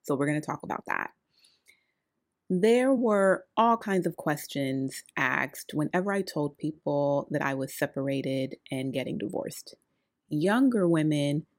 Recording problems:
uneven, jittery; strongly; from 0.5 to 11 s

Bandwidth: 16 kHz